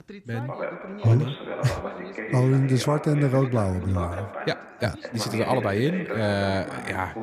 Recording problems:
background chatter; loud; throughout; 2 voices, 9 dB below the speech

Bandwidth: 14.5 kHz